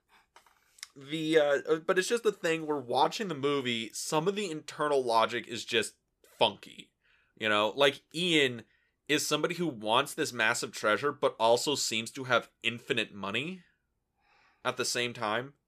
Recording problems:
none

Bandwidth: 14.5 kHz